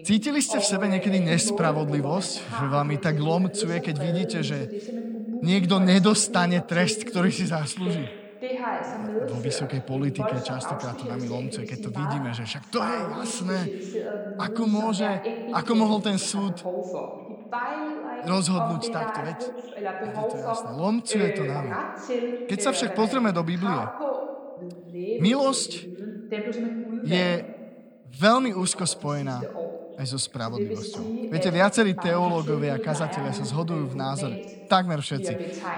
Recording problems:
voice in the background; loud; throughout; 7 dB below the speech

